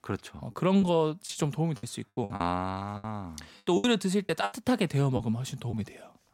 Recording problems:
choppy; very; 9% of the speech affected

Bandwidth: 16 kHz